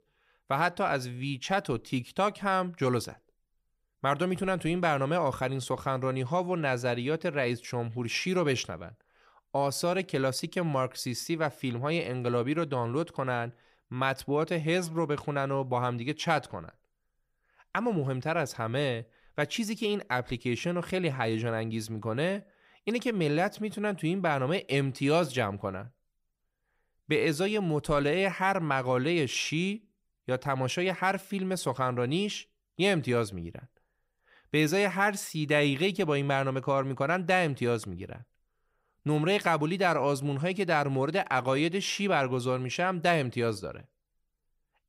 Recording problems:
none

